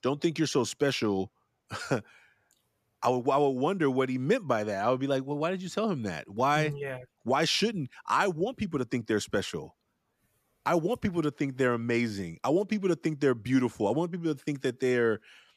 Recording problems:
none

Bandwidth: 14.5 kHz